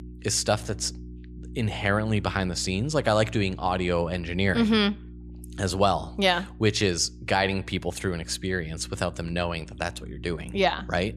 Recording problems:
electrical hum; faint; throughout; 60 Hz, 25 dB below the speech

